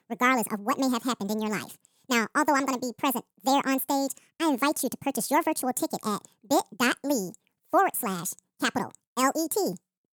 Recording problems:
wrong speed and pitch; too fast and too high; 1.6 times normal speed

